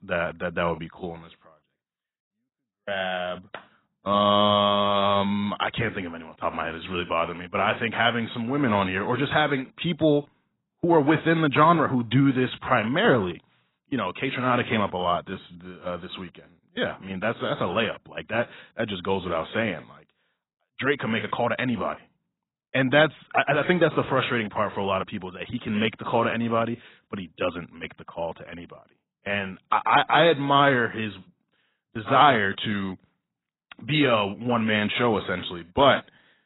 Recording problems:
garbled, watery; badly; nothing above 4 kHz

